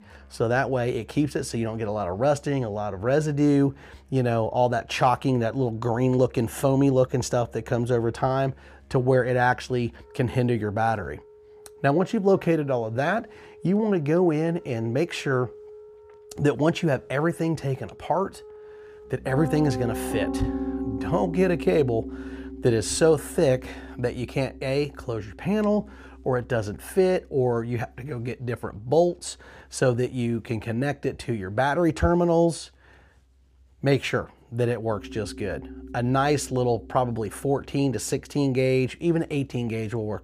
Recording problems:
background music; noticeable; throughout; 15 dB below the speech

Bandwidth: 15 kHz